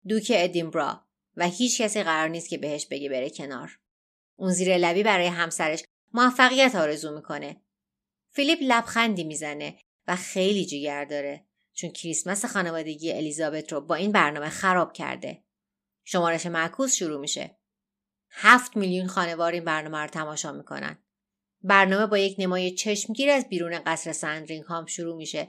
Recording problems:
none

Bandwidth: 14.5 kHz